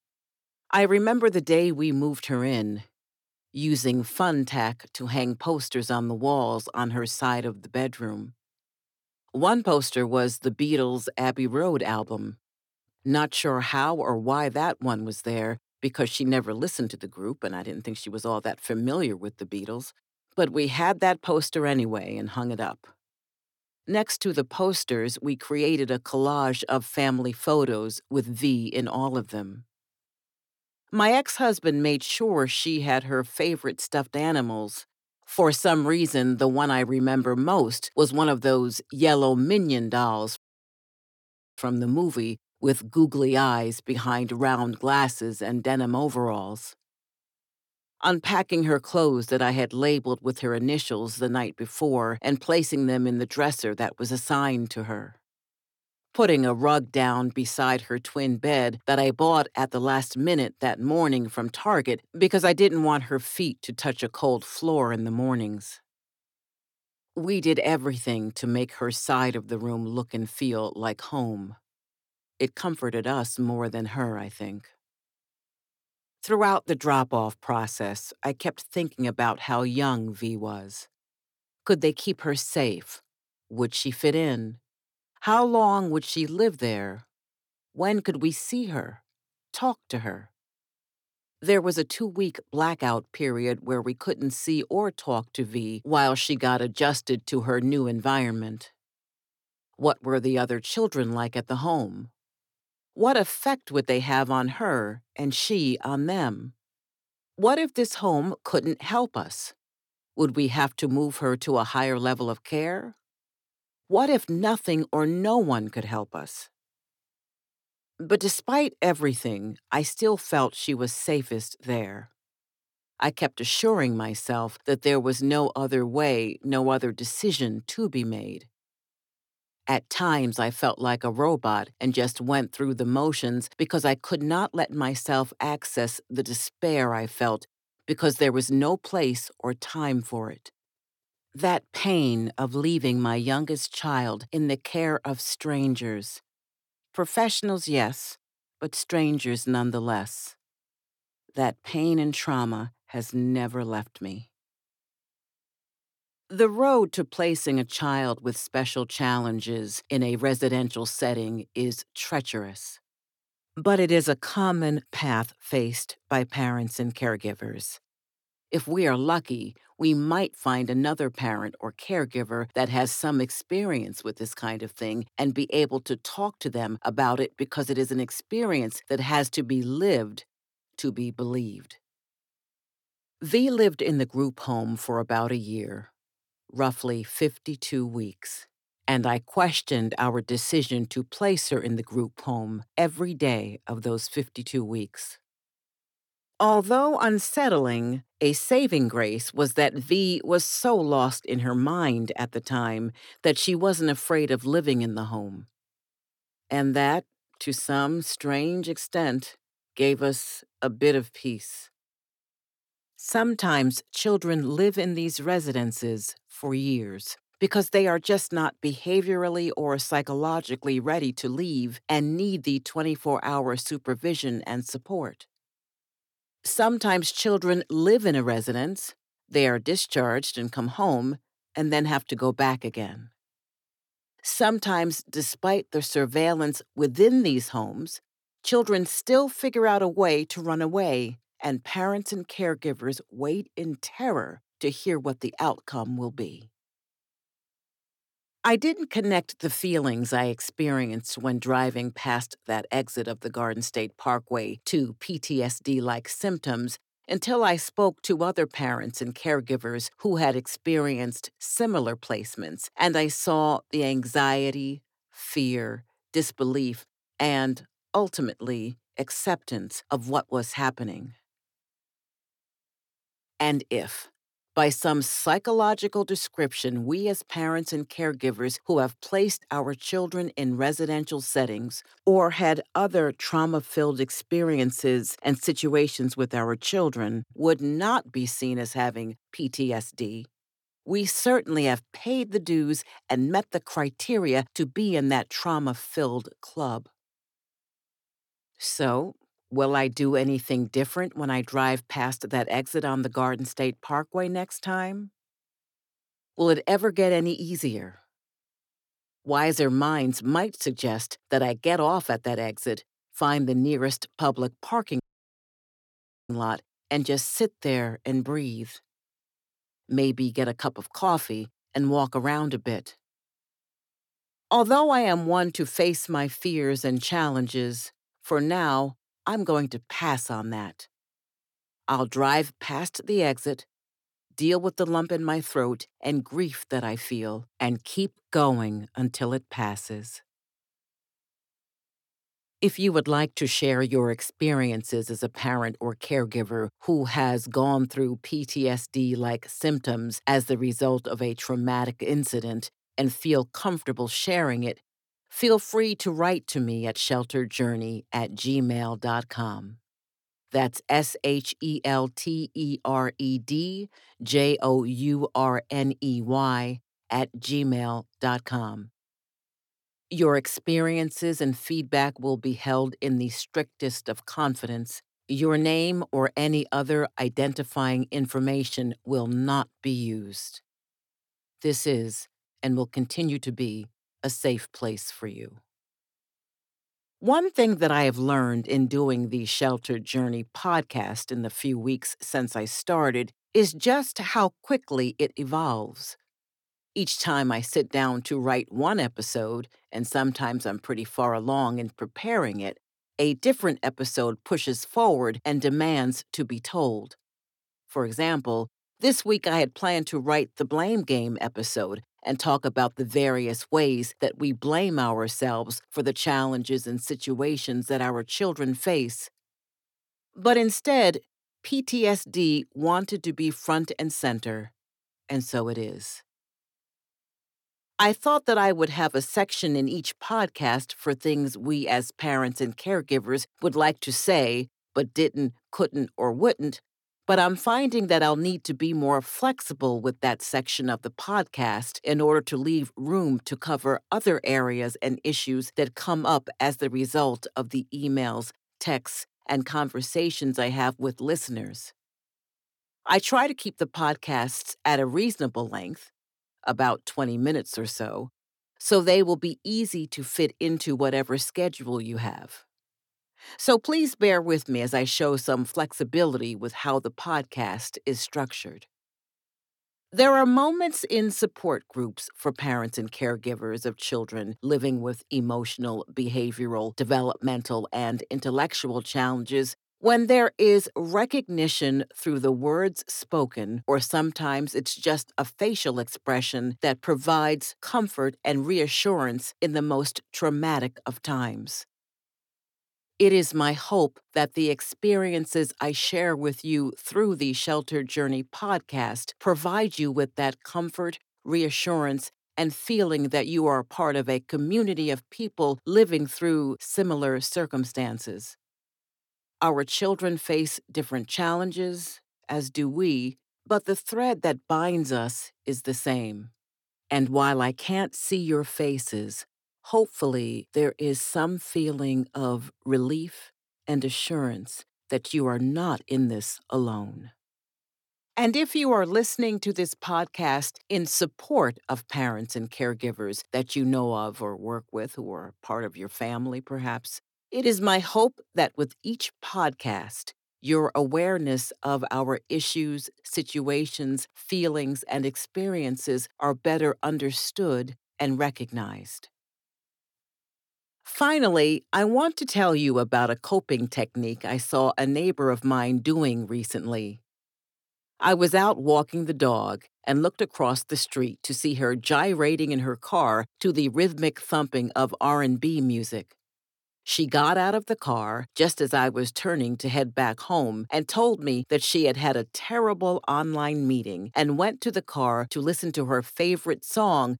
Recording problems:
audio cutting out; at 40 s for 1 s and at 5:15 for 1.5 s

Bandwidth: 18.5 kHz